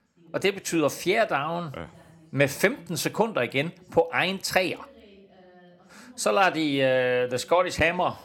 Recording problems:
voice in the background; faint; throughout; 30 dB below the speech

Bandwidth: 17 kHz